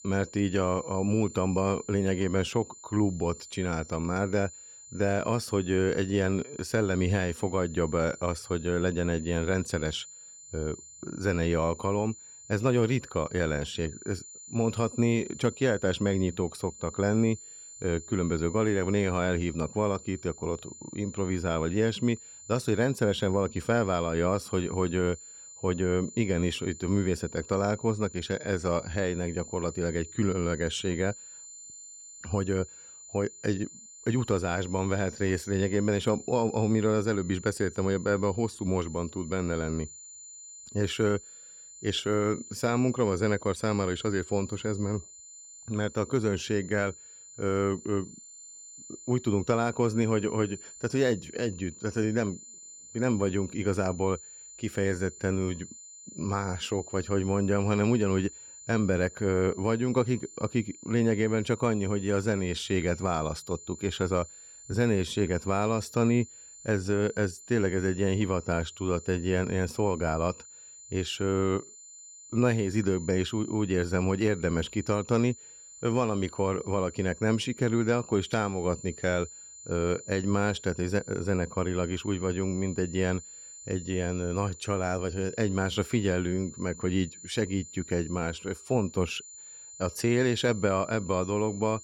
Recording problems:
high-pitched whine; noticeable; throughout; 7 kHz, 15 dB below the speech

